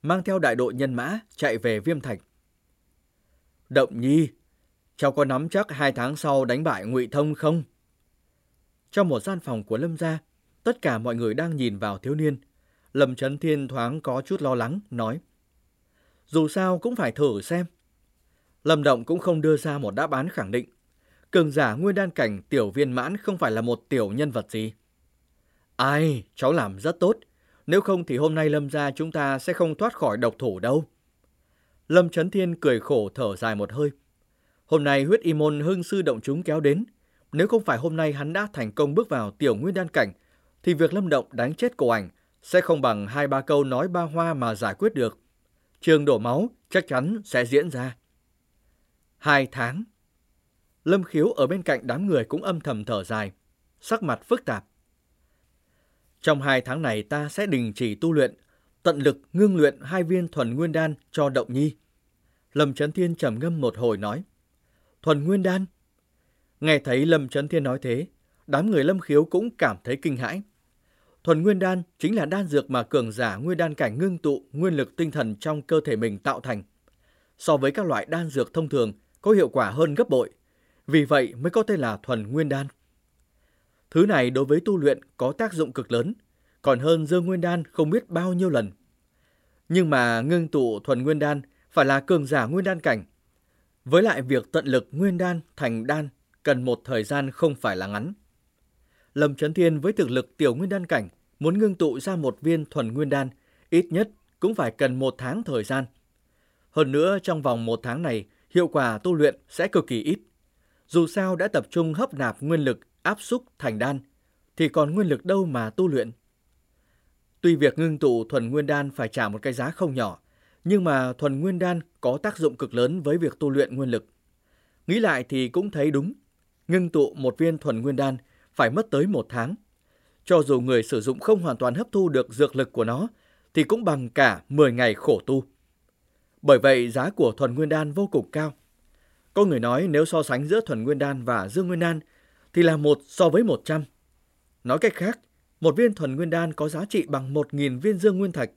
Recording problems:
none

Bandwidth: 16 kHz